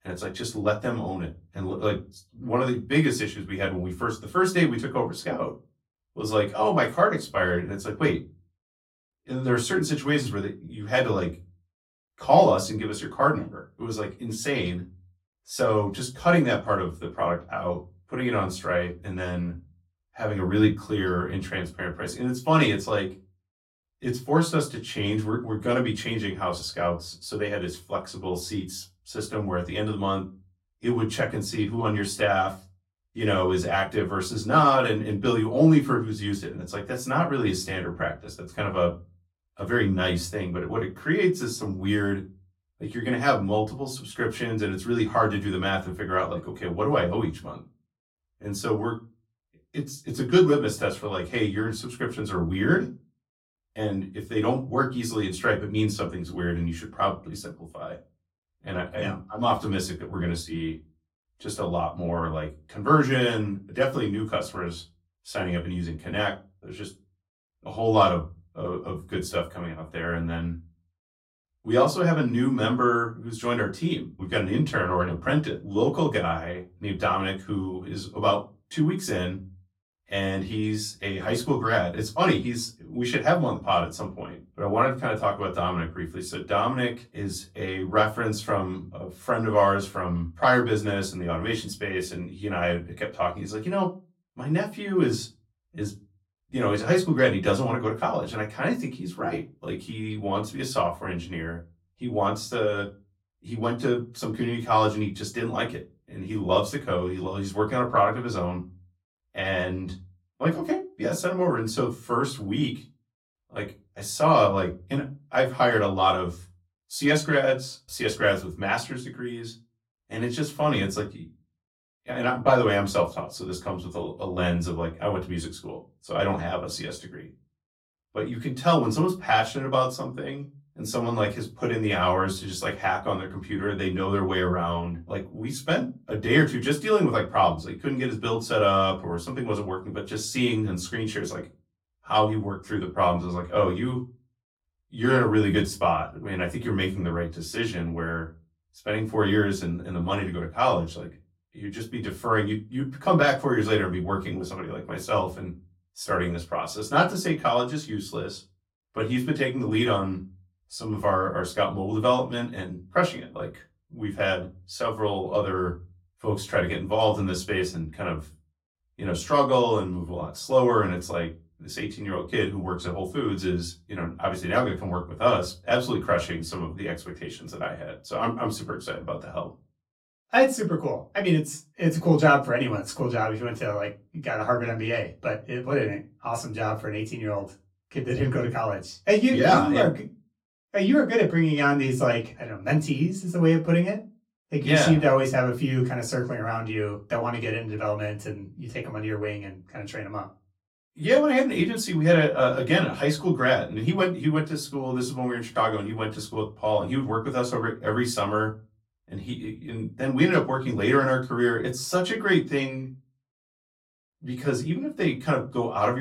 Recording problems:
off-mic speech; far
room echo; very slight; dies away in 0.2 s
abrupt cut into speech; at the end

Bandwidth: 16.5 kHz